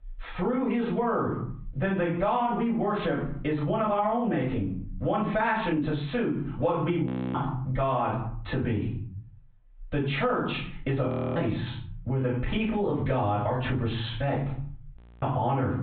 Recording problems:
off-mic speech; far
high frequencies cut off; severe; nothing above 4 kHz
squashed, flat; heavily
room echo; slight; dies away in 0.4 s
audio freezing; at 7 s, at 11 s and at 15 s

